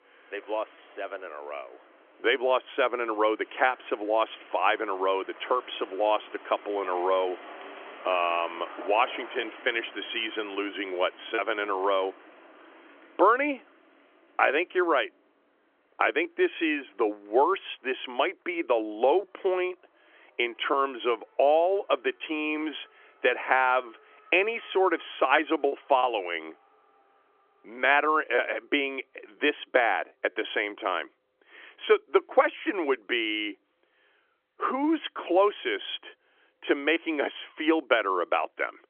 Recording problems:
phone-call audio; nothing above 3.5 kHz
traffic noise; faint; throughout; 20 dB below the speech
choppy; occasionally; 1% of the speech affected

